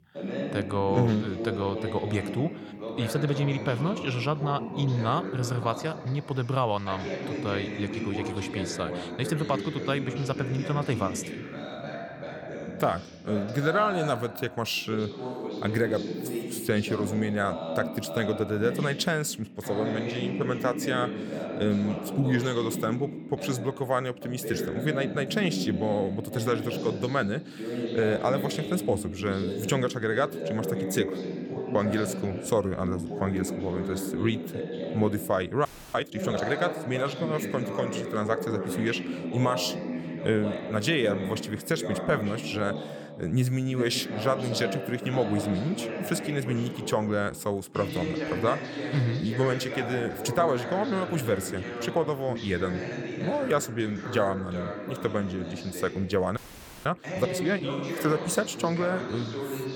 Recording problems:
voice in the background; loud; throughout; 5 dB below the speech
audio freezing; at 36 s and at 56 s

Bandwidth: 18.5 kHz